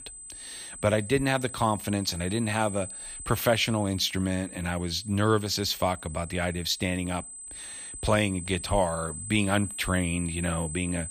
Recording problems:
high-pitched whine; noticeable; throughout; 8 kHz, 10 dB below the speech

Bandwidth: 15 kHz